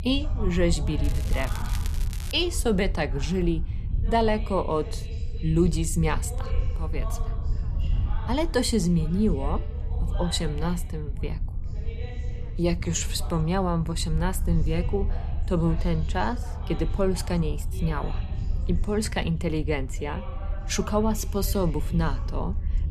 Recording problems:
background chatter; noticeable; throughout; 2 voices, 20 dB below the speech
low rumble; noticeable; throughout; 20 dB below the speech
crackling; noticeable; from 1 to 2.5 s; 15 dB below the speech

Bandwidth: 13.5 kHz